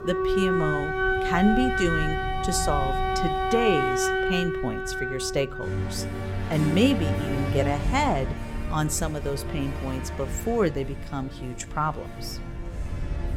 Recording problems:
background music; loud; throughout; as loud as the speech
low rumble; faint; throughout; 25 dB below the speech

